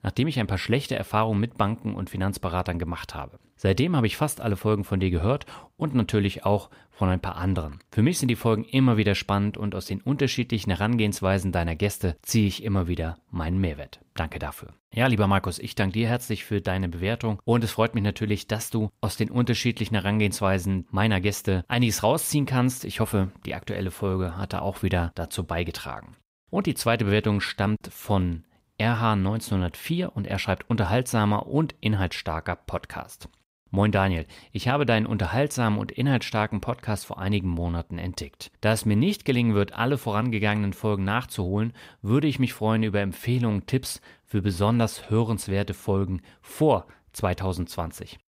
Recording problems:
none

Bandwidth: 15.5 kHz